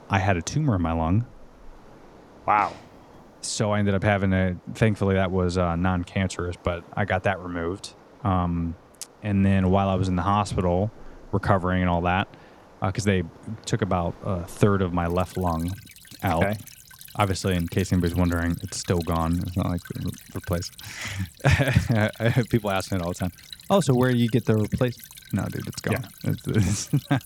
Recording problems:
rain or running water; faint; throughout; 20 dB below the speech

